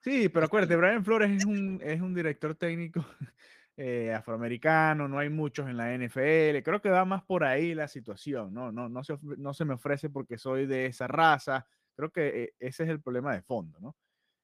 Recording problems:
garbled, watery; slightly; nothing above 15 kHz

